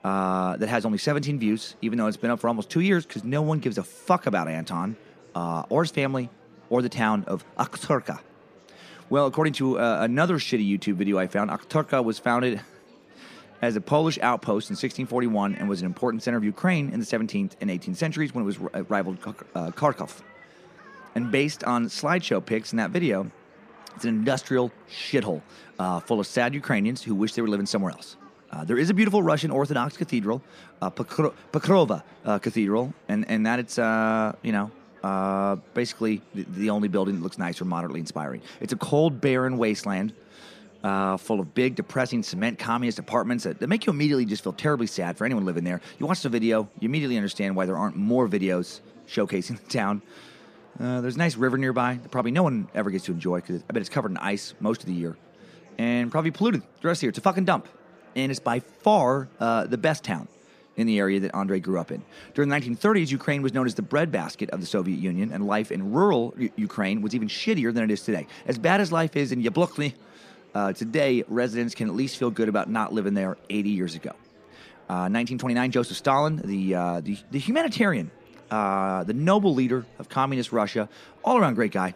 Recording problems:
murmuring crowd; faint; throughout; 25 dB below the speech

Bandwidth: 15 kHz